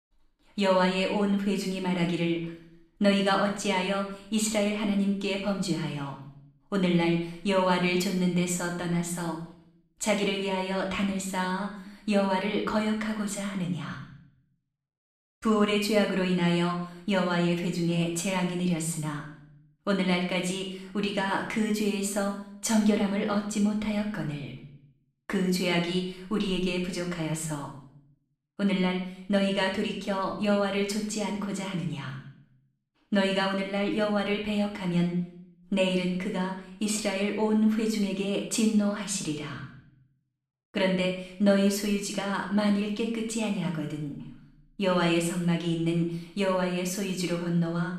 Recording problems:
room echo; noticeable; dies away in 0.6 s
off-mic speech; somewhat distant

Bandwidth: 13.5 kHz